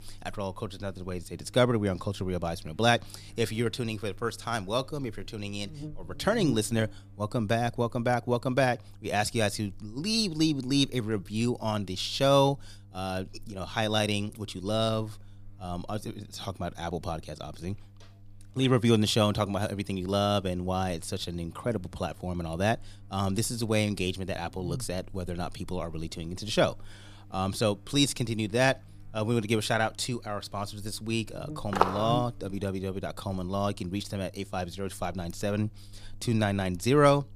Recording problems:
electrical hum; faint; throughout; 50 Hz, 25 dB below the speech
footsteps; loud; at 32 s; peak 2 dB above the speech

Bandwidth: 15 kHz